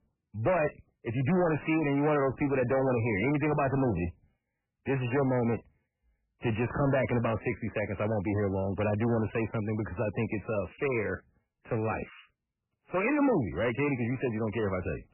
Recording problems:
distortion; heavy; 7 dB below the speech
garbled, watery; badly; nothing above 2.5 kHz

